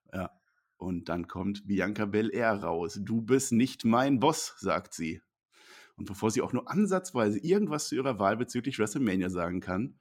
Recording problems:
none

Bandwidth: 16.5 kHz